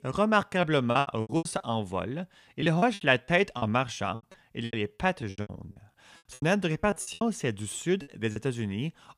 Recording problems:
choppy; very; 17% of the speech affected

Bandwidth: 15 kHz